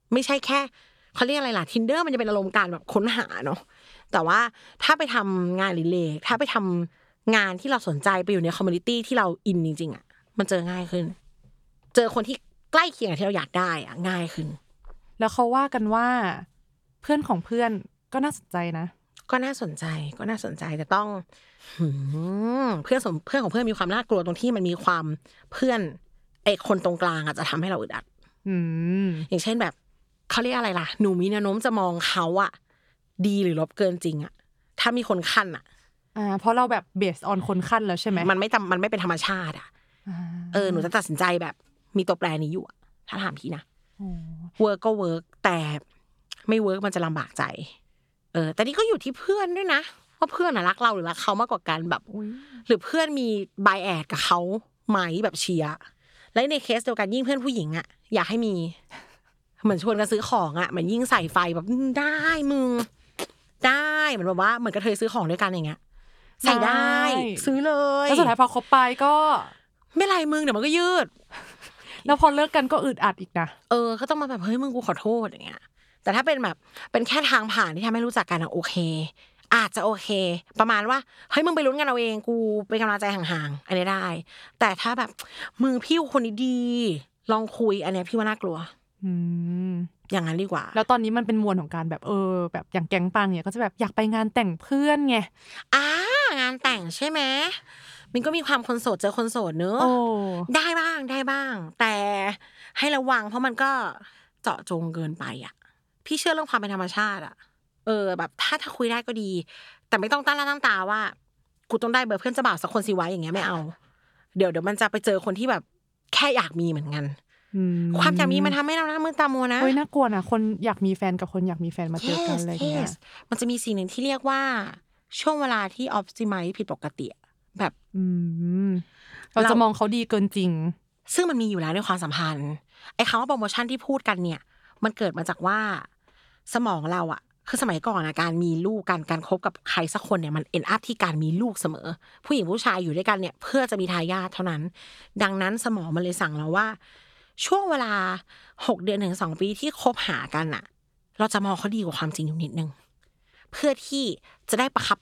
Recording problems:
none

